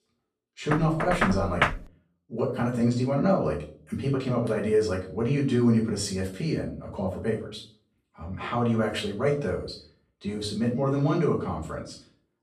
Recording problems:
off-mic speech; far
room echo; slight; dies away in 0.4 s
door banging; loud; from 0.5 to 2 s; peak 1 dB above the speech

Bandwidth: 14.5 kHz